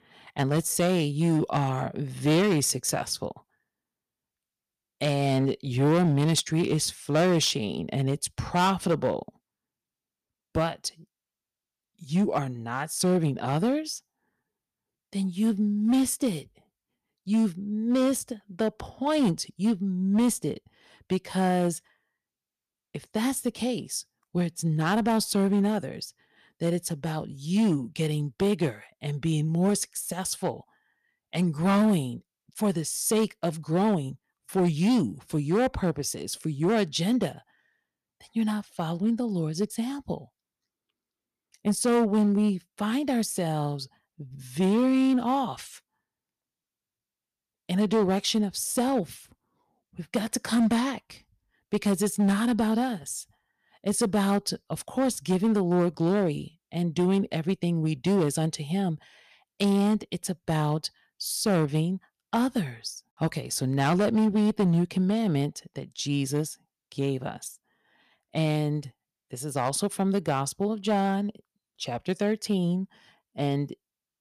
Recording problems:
distortion; slight; 5% of the sound clipped

